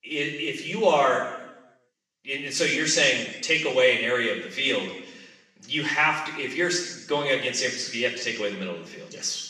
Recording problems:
off-mic speech; far
room echo; noticeable; dies away in 0.9 s
thin; somewhat; fading below 350 Hz

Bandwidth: 14.5 kHz